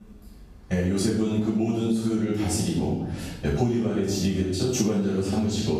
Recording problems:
room echo; strong; dies away in 0.8 s
off-mic speech; far
echo of what is said; faint; from 3.5 s on; 510 ms later, 25 dB below the speech
squashed, flat; somewhat

